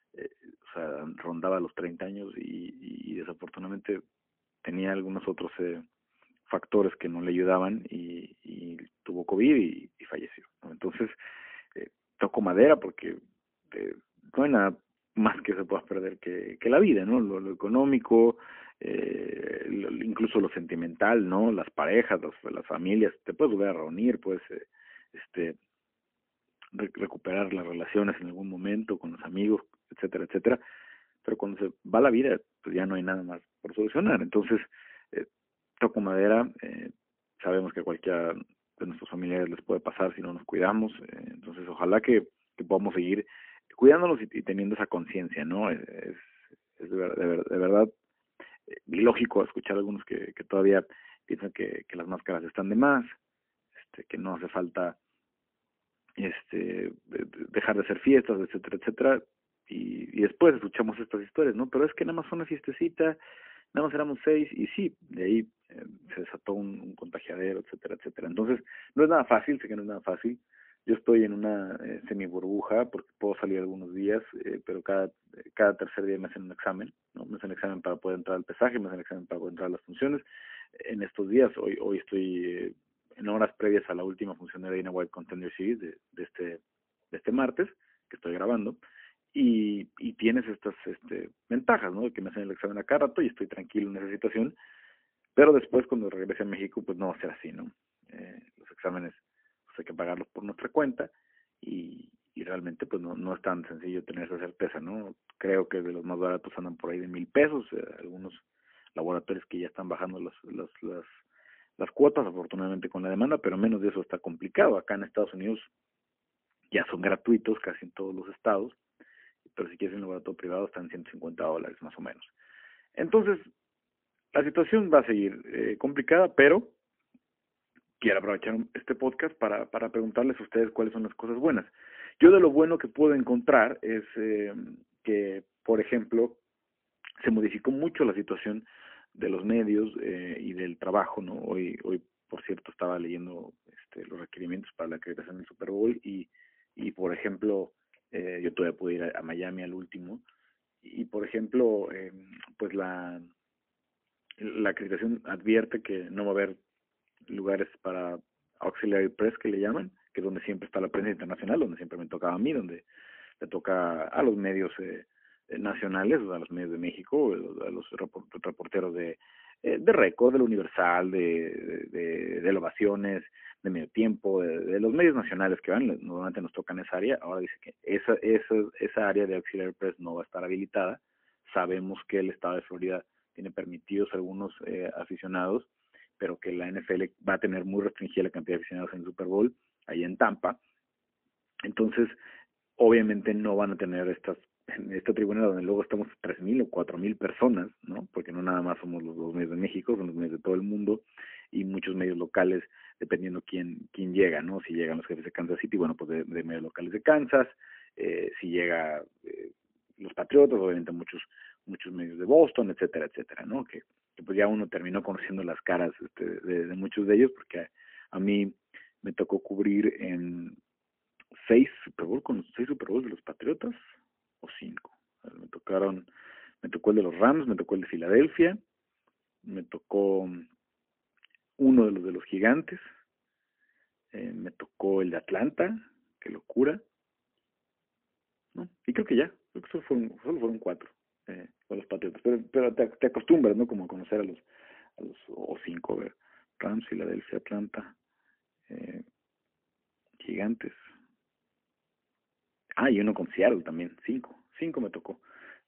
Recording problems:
phone-call audio; poor line

